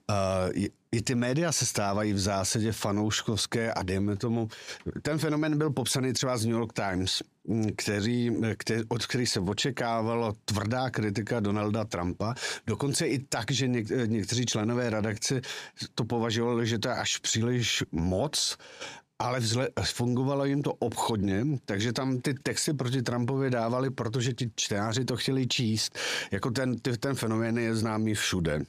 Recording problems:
squashed, flat; heavily

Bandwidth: 15 kHz